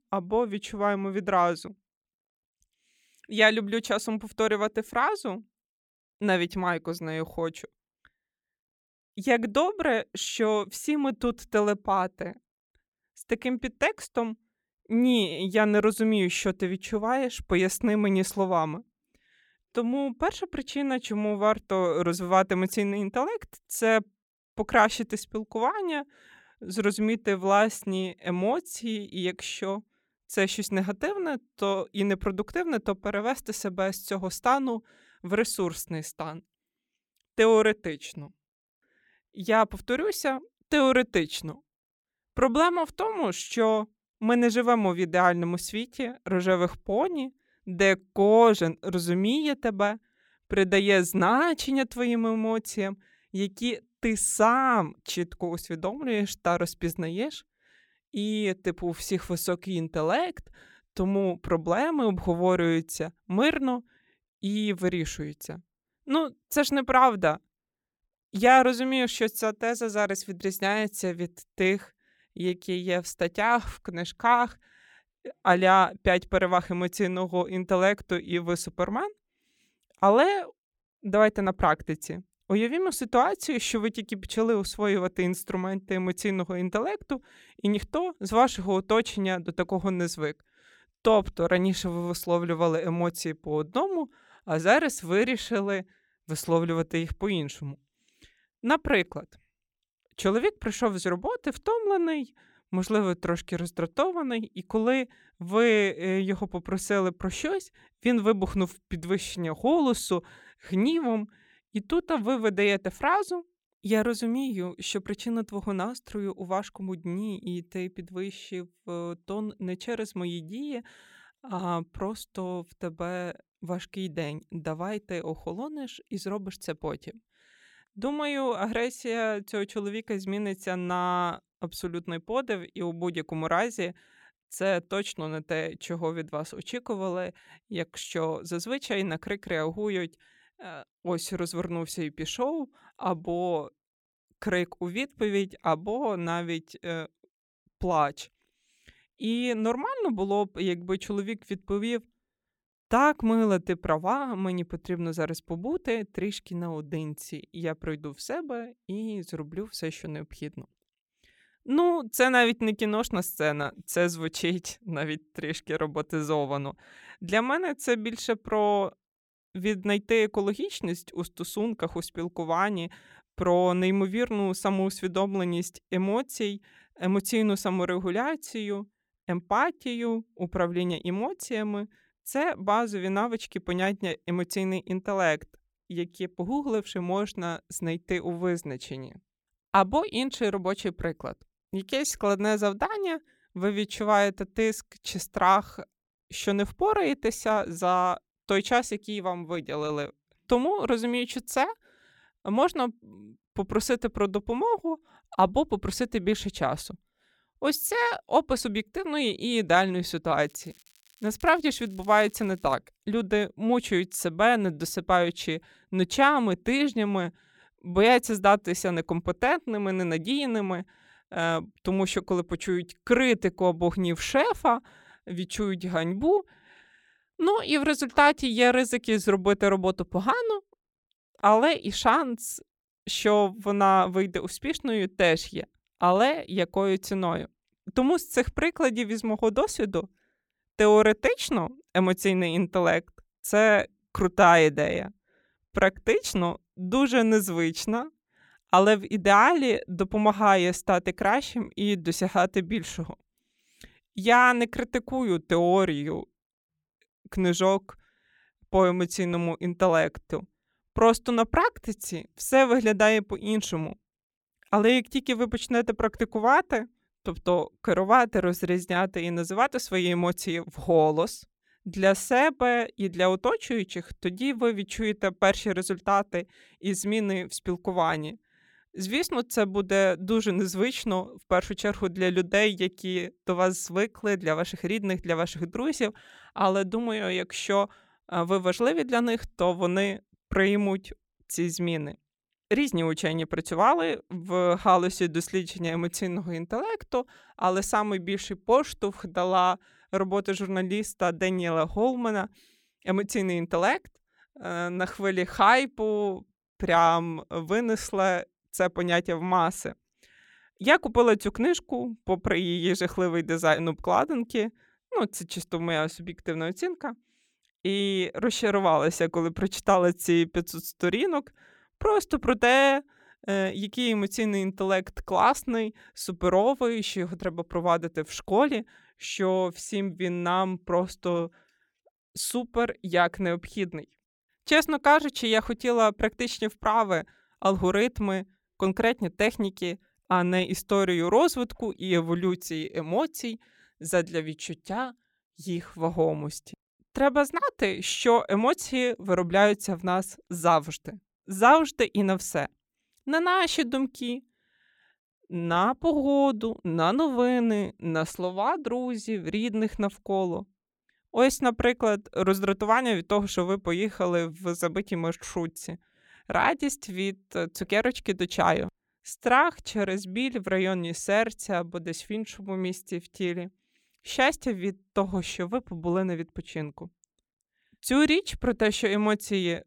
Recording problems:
crackling; faint; from 3:30 to 3:33; 30 dB below the speech

